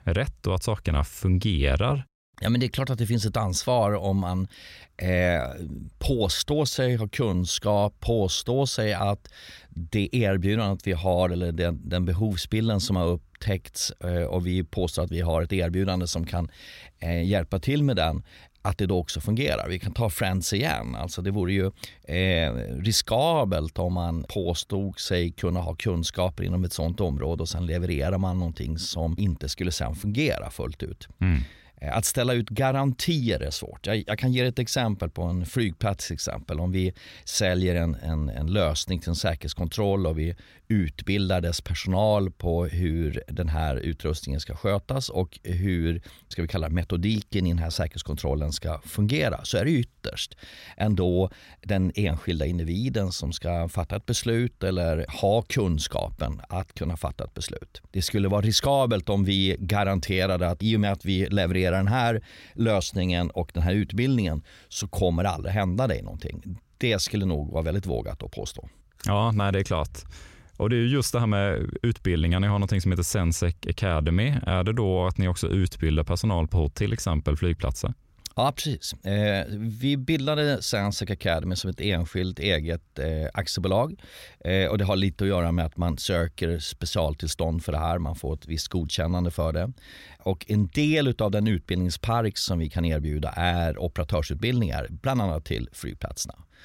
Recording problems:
none

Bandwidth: 16 kHz